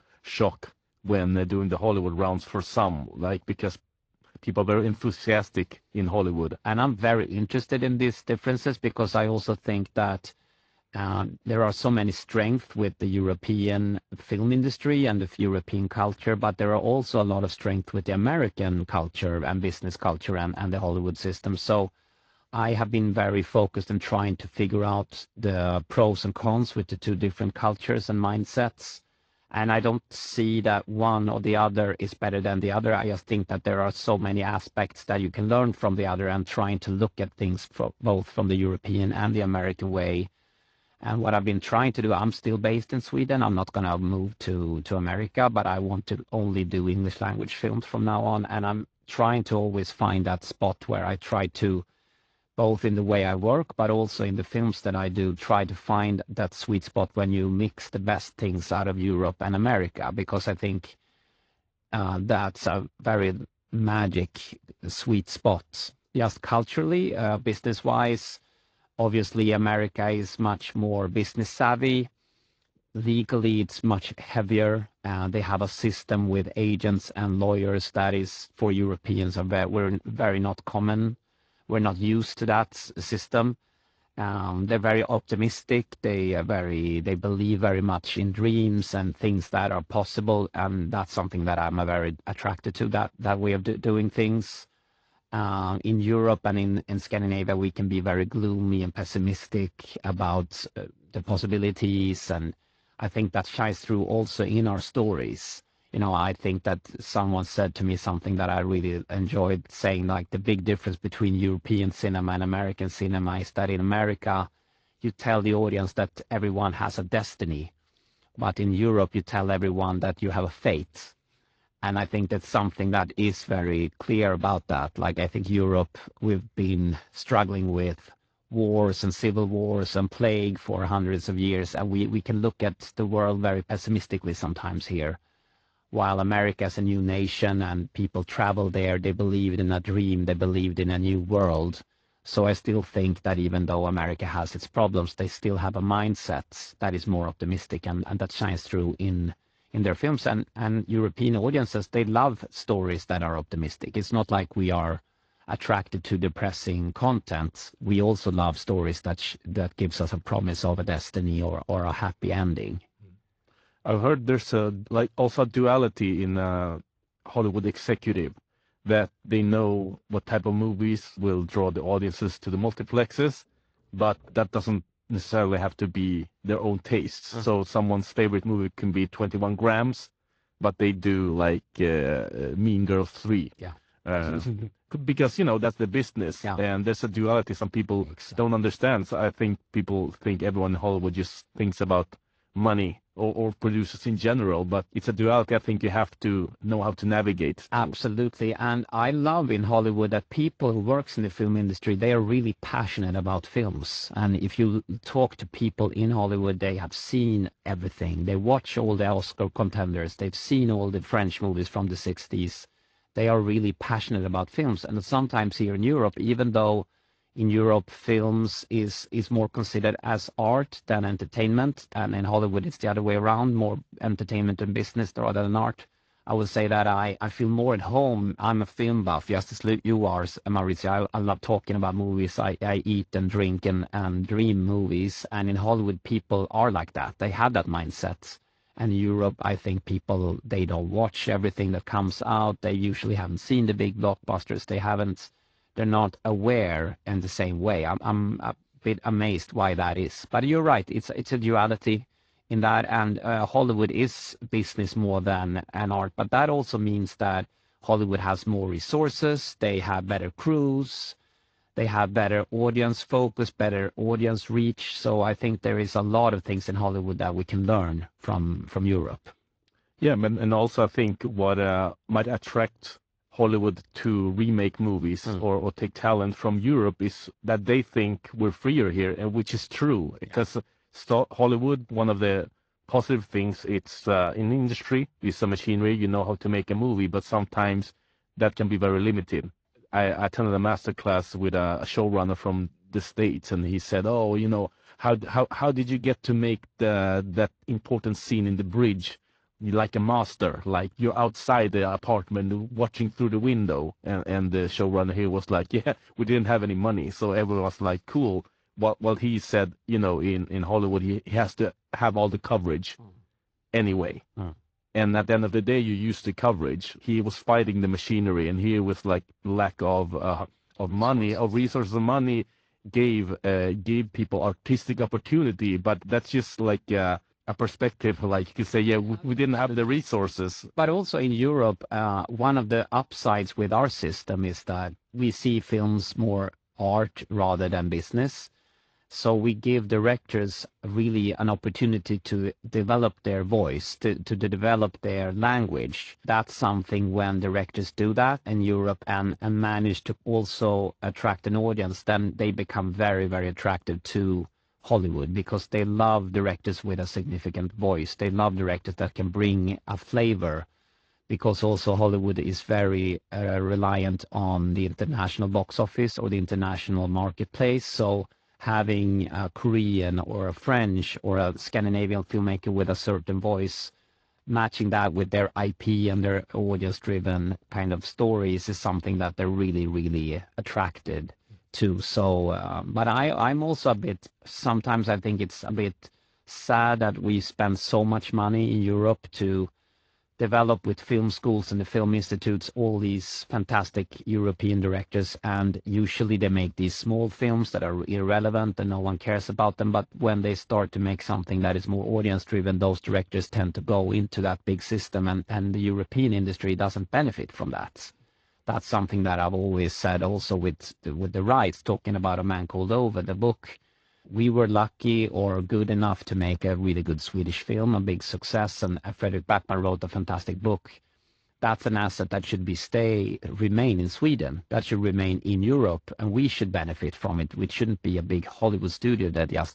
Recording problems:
garbled, watery; slightly

